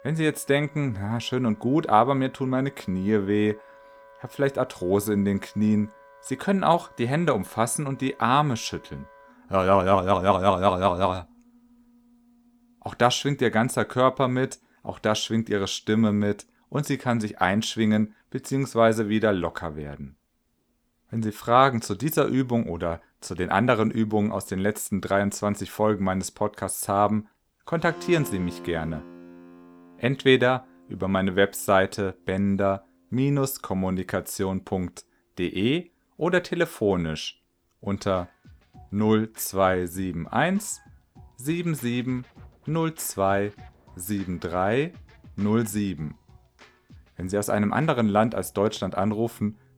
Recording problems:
background music; faint; throughout; 25 dB below the speech

